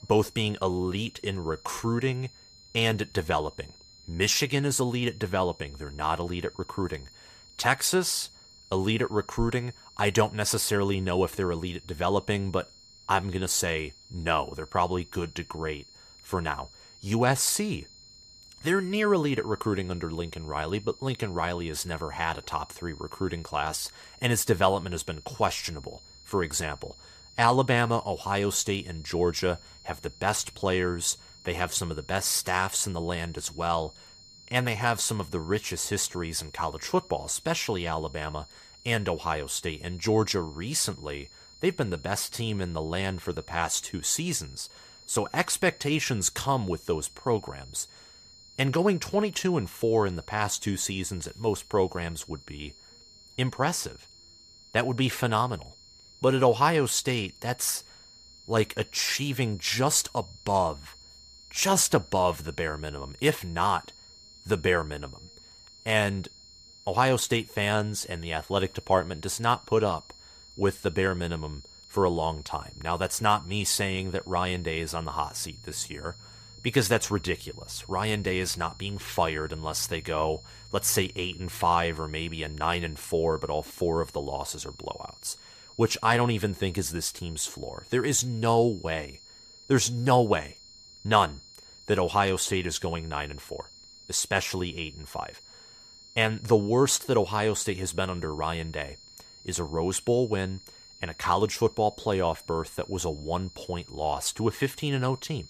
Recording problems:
high-pitched whine; faint; throughout; 4 kHz, 20 dB below the speech

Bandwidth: 14.5 kHz